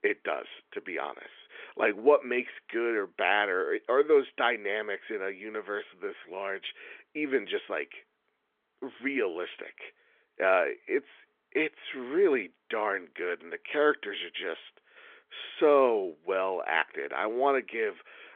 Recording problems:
phone-call audio; nothing above 3.5 kHz

